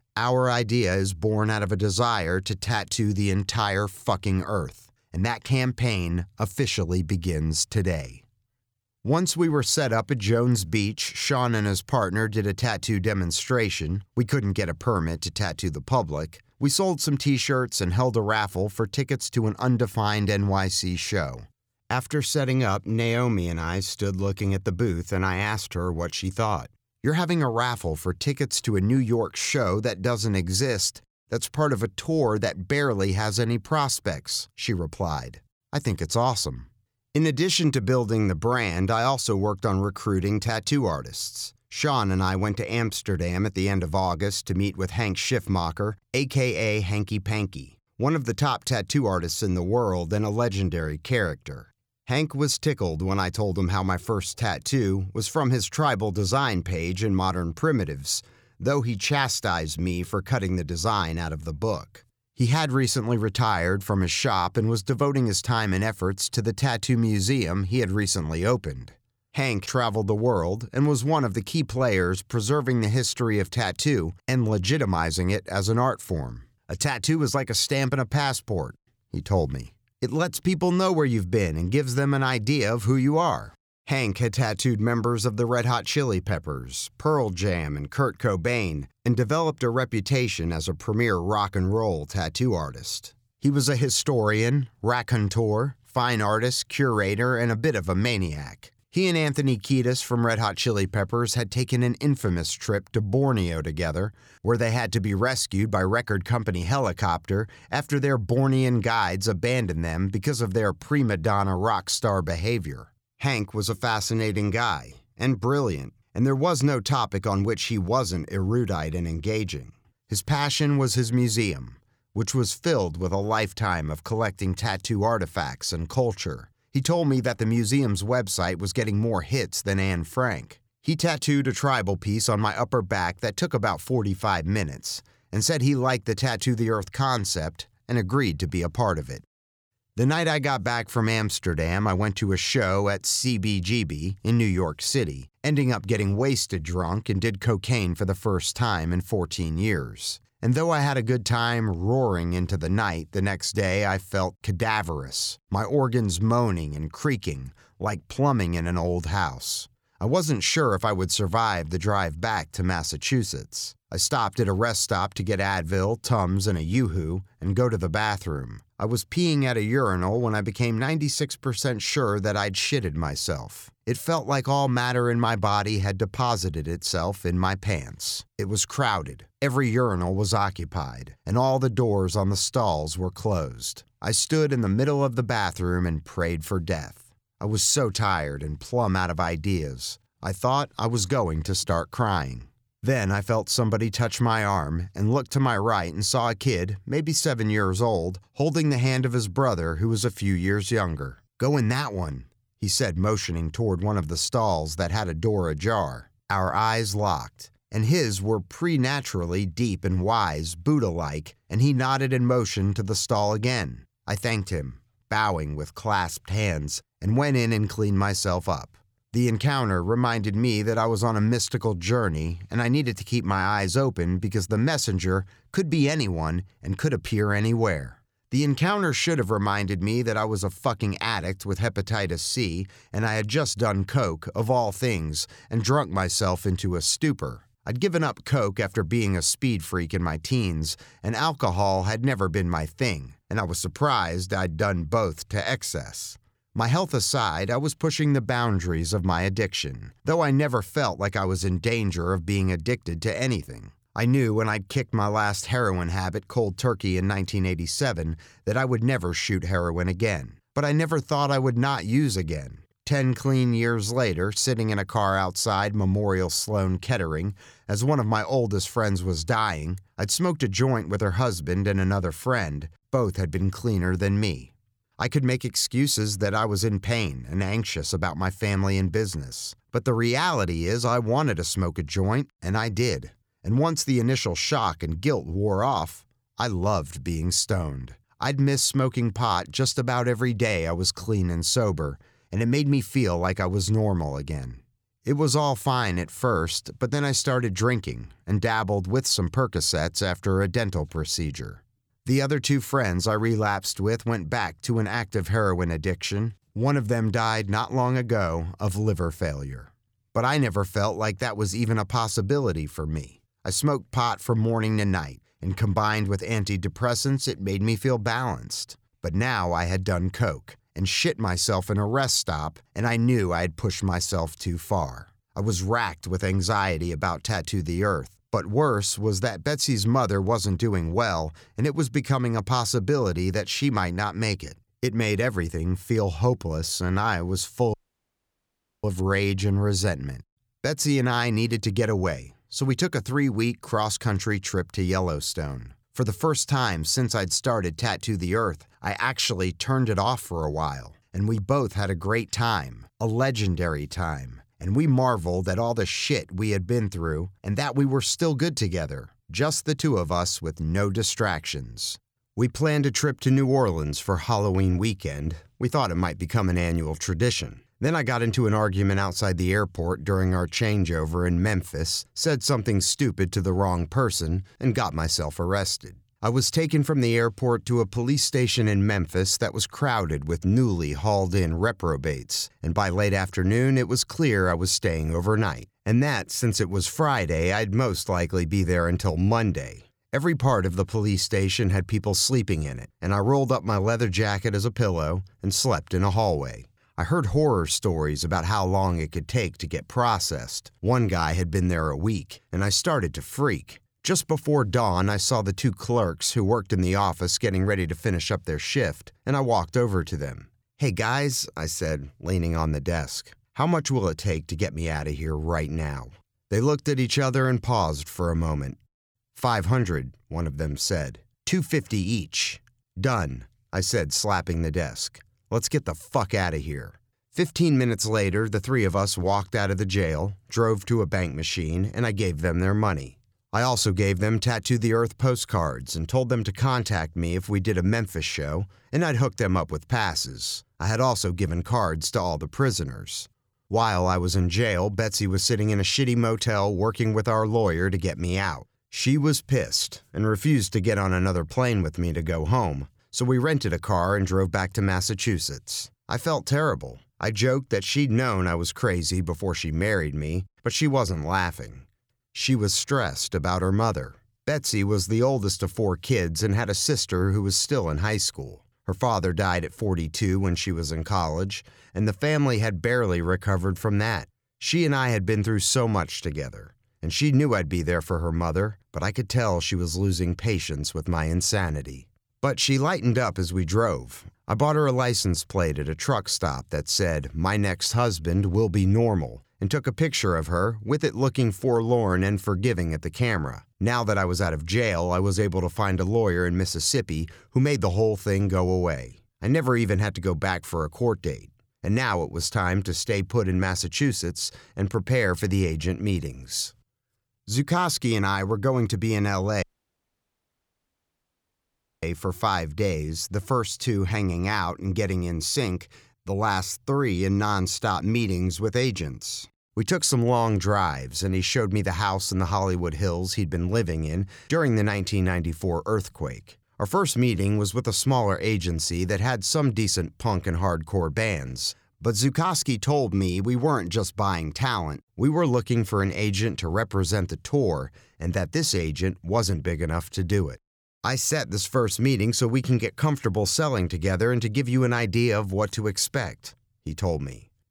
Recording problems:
audio cutting out; at 5:38 for 1 s and at 8:30 for 2.5 s

